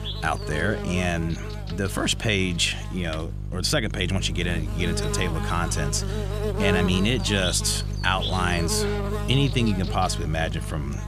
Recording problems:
electrical hum; loud; throughout; 50 Hz, 7 dB below the speech

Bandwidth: 14.5 kHz